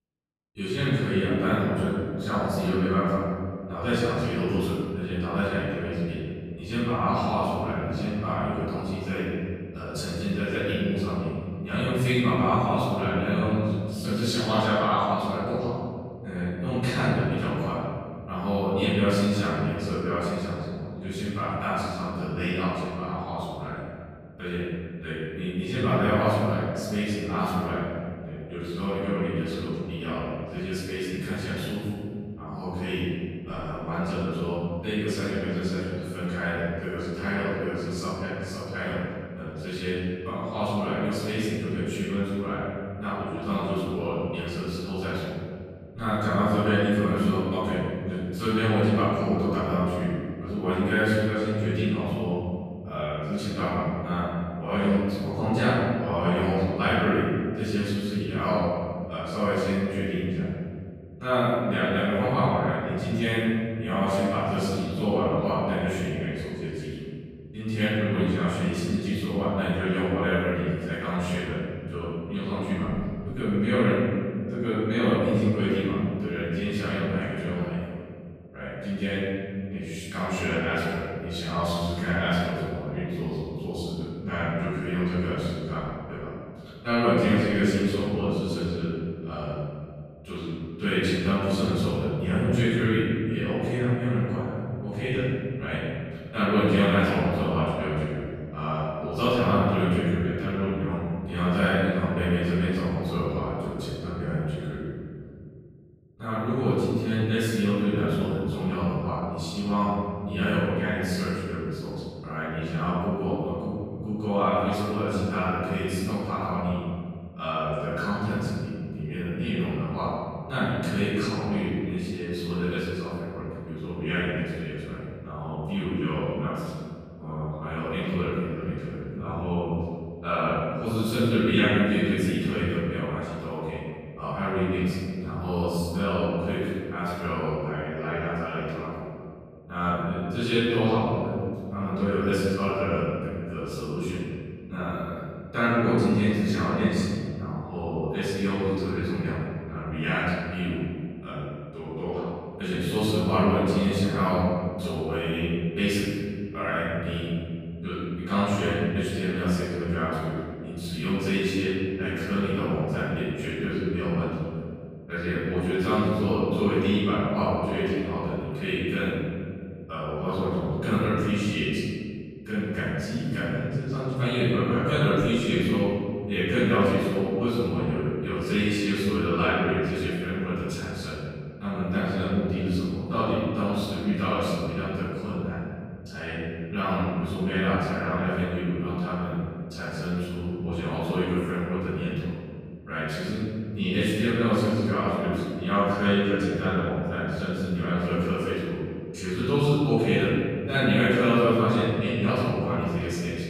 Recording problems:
room echo; strong; dies away in 2.3 s
off-mic speech; far

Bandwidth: 15 kHz